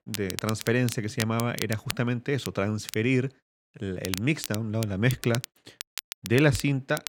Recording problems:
crackle, like an old record; noticeable; 10 dB below the speech

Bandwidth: 16.5 kHz